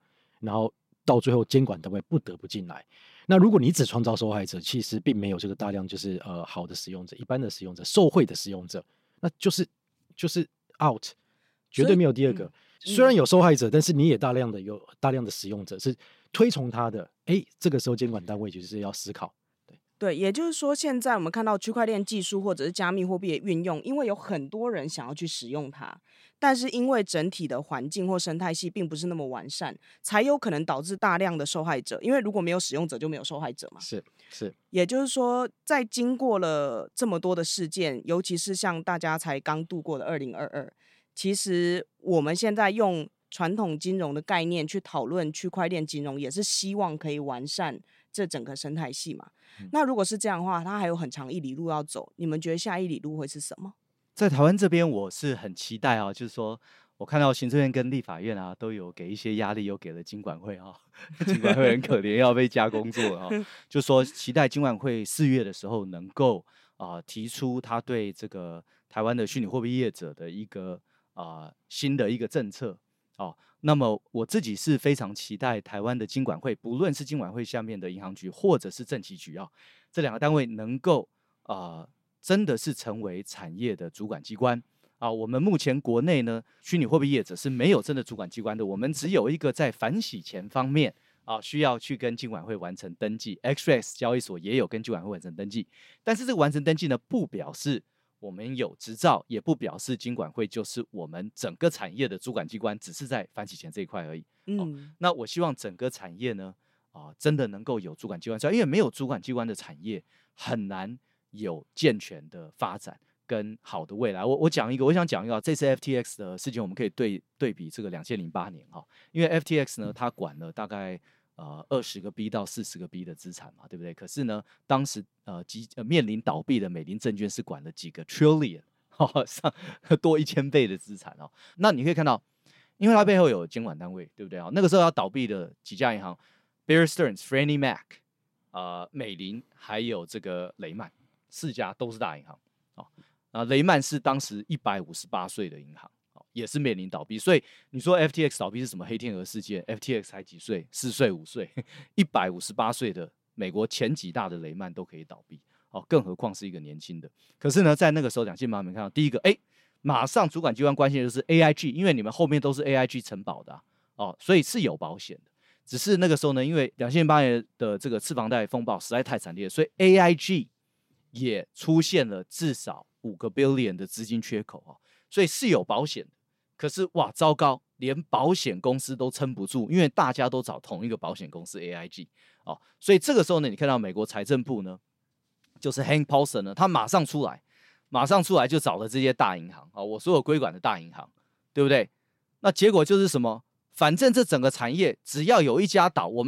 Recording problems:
abrupt cut into speech; at the end

